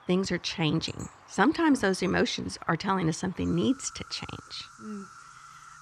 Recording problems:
animal sounds; faint; throughout; 20 dB below the speech

